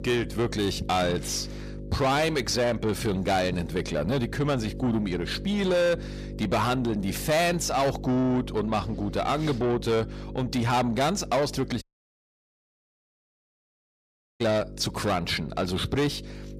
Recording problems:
distortion; heavy; 8 dB below the speech
electrical hum; noticeable; throughout; 50 Hz, 20 dB below the speech
audio cutting out; at 12 s for 2.5 s

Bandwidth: 14.5 kHz